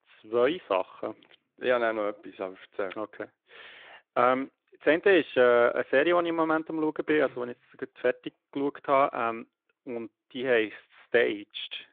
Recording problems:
phone-call audio

